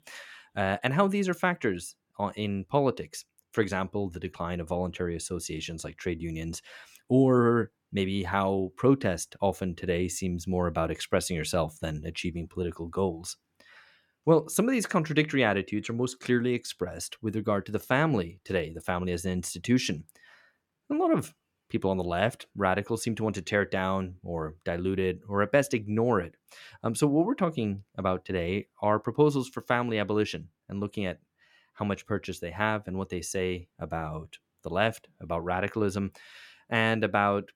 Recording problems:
none

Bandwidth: 17.5 kHz